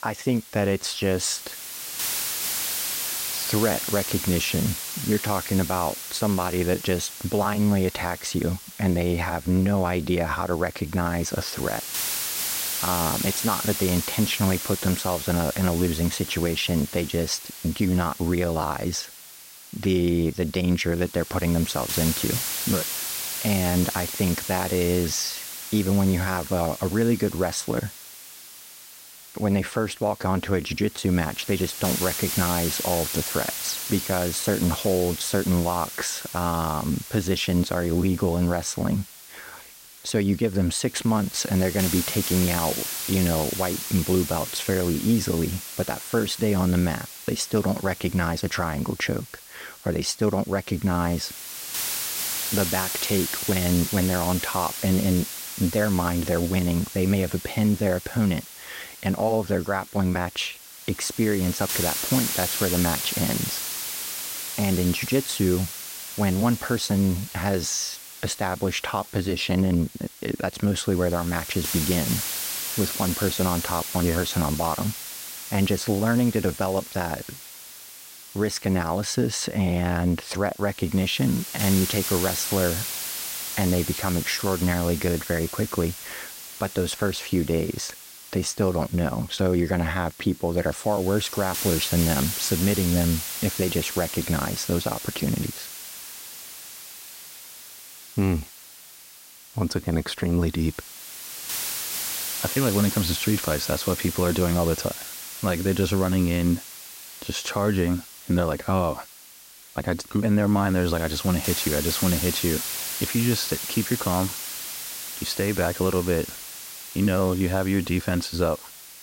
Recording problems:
hiss; loud; throughout; 5 dB below the speech

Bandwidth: 16 kHz